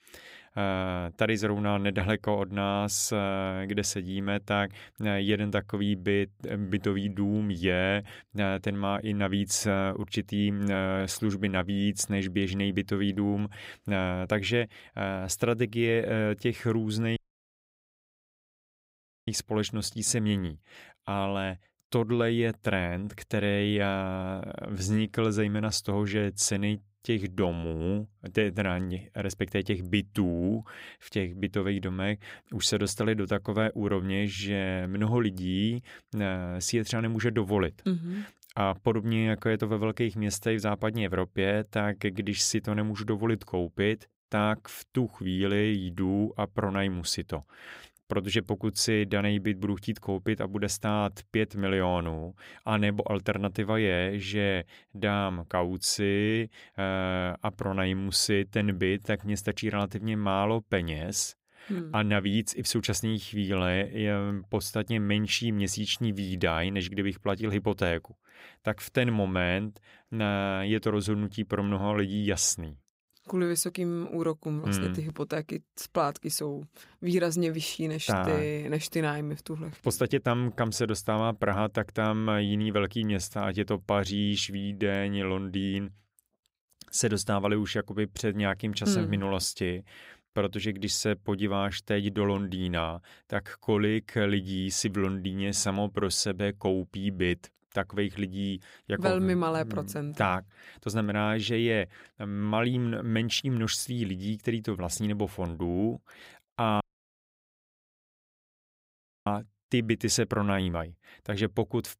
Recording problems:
audio cutting out; at 17 s for 2 s and at 1:47 for 2.5 s

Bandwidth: 15.5 kHz